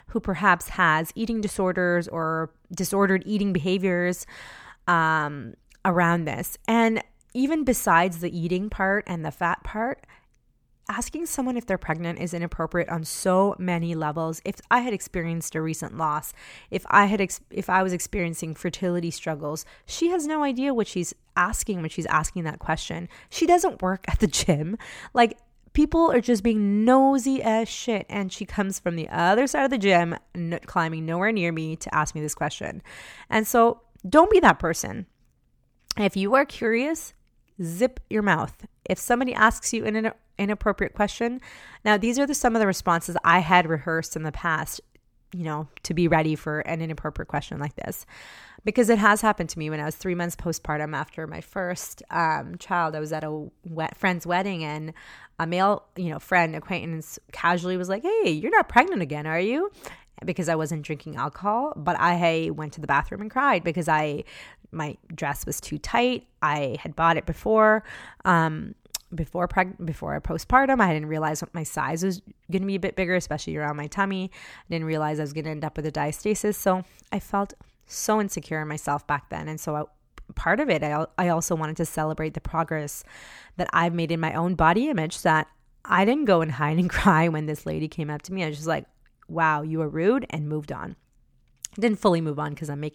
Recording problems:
none

